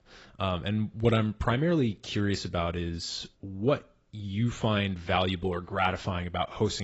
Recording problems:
garbled, watery; badly; nothing above 7.5 kHz
abrupt cut into speech; at the end

